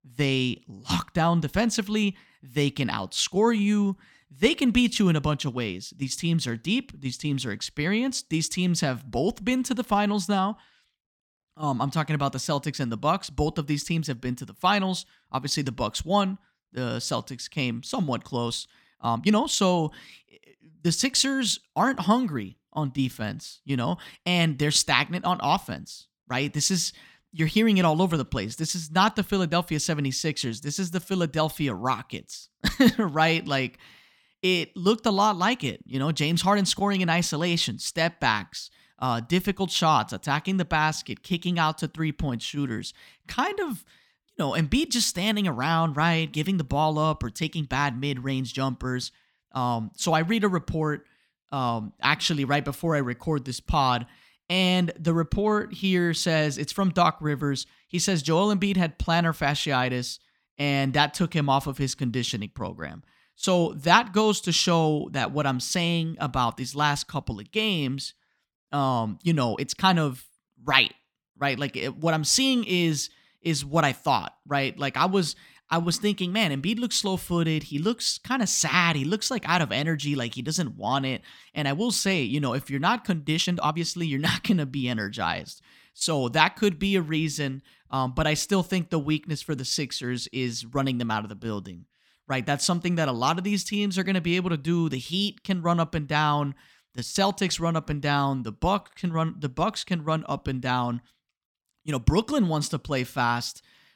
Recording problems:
uneven, jittery; strongly; from 19 s to 1:24

